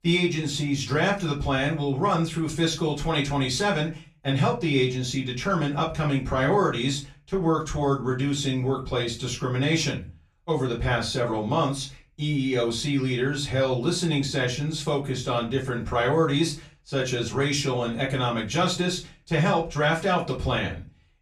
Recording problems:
off-mic speech; far
room echo; very slight; dies away in 0.3 s

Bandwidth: 14 kHz